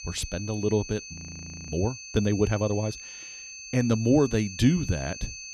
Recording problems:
high-pitched whine; noticeable; throughout; 6.5 kHz, 10 dB below the speech
audio freezing; at 1 s for 0.5 s

